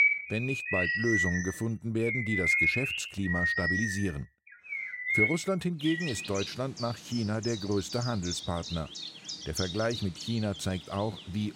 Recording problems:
animal sounds; very loud; throughout; 2 dB above the speech

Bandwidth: 16 kHz